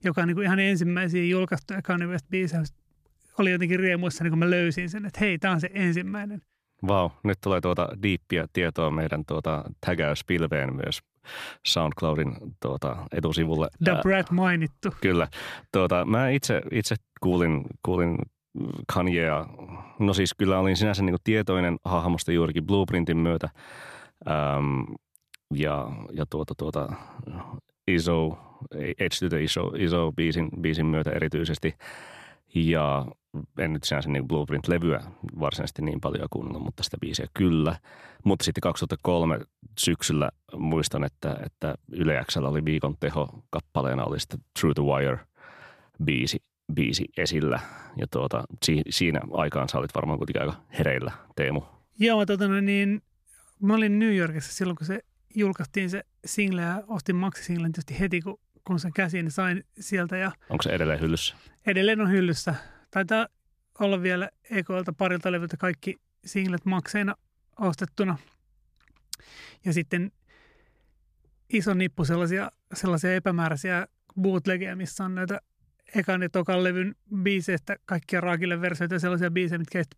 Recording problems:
none

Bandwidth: 14.5 kHz